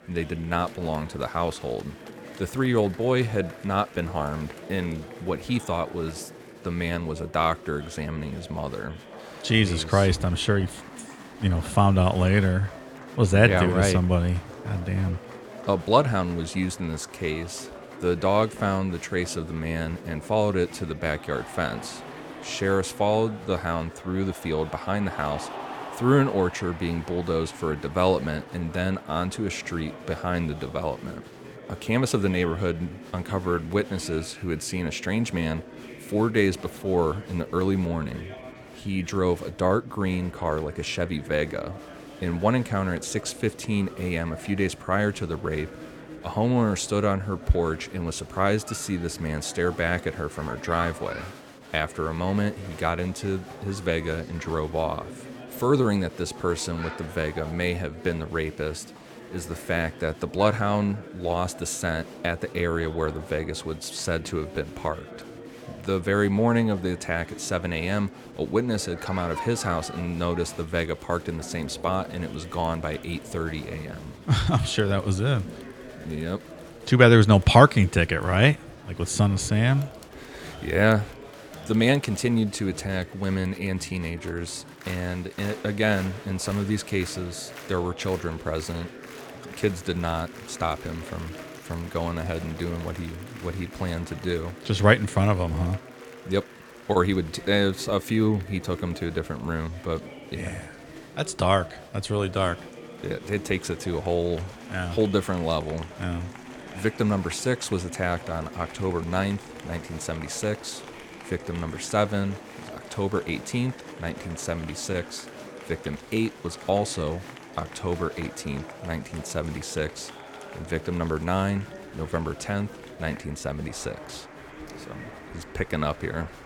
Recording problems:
chatter from many people; noticeable; throughout; 15 dB below the speech

